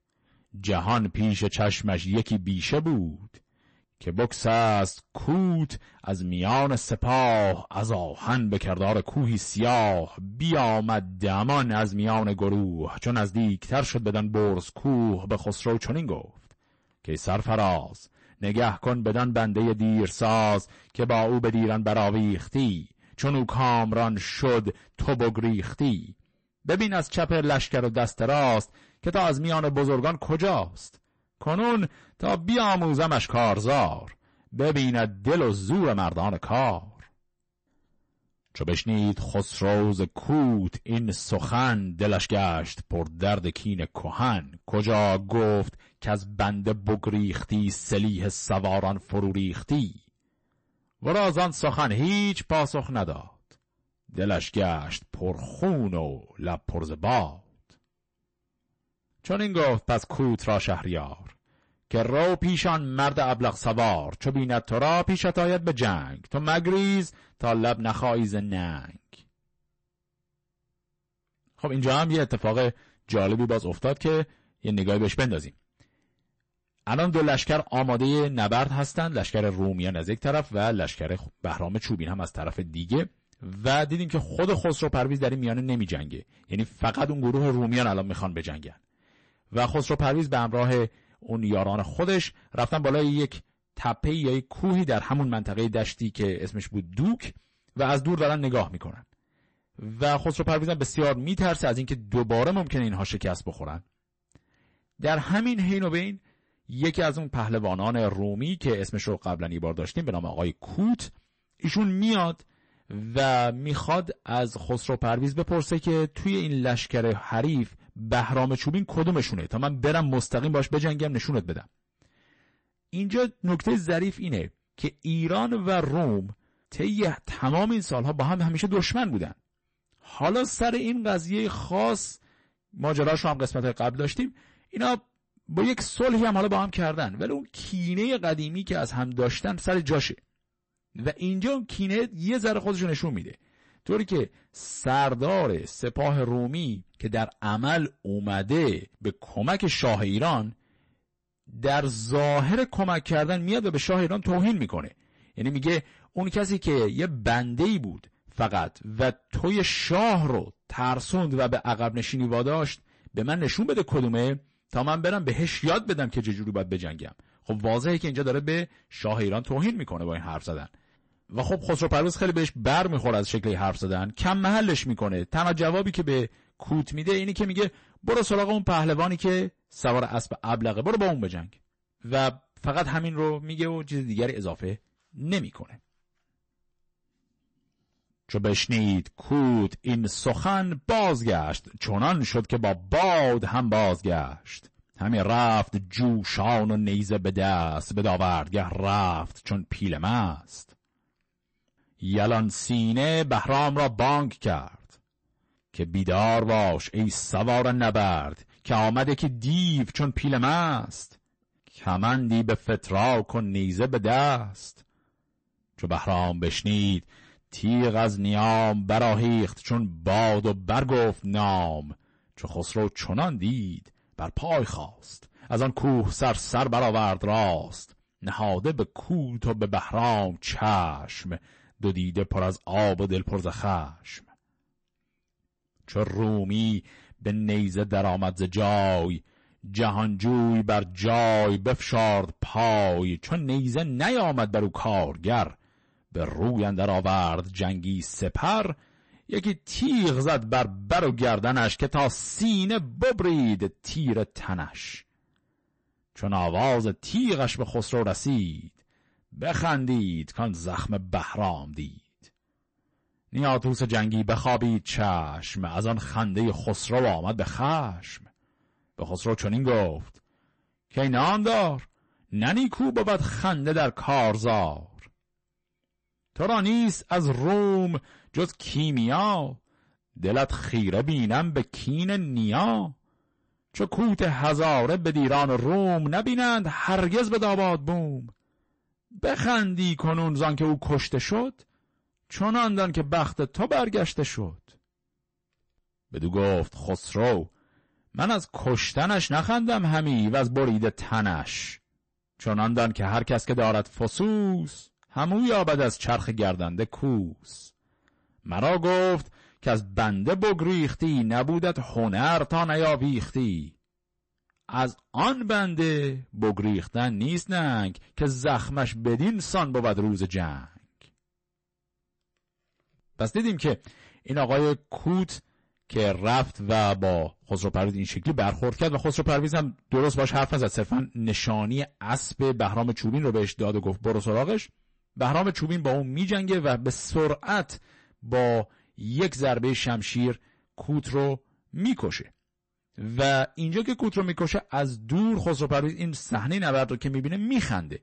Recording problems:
distortion; heavy; 9% of the sound clipped
garbled, watery; slightly; nothing above 8 kHz

